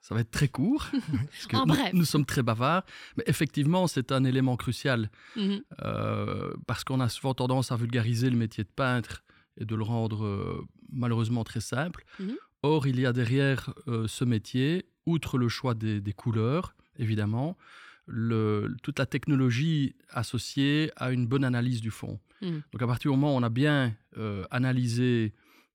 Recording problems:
none

